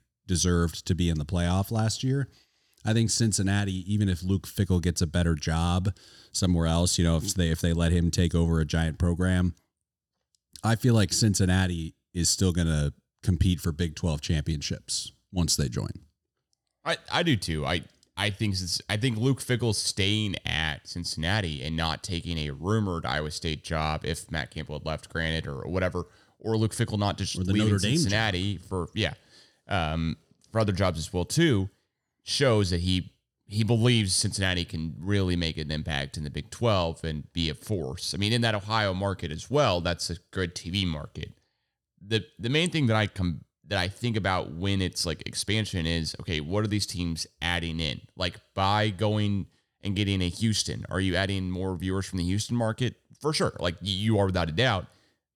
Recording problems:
none

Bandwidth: 19 kHz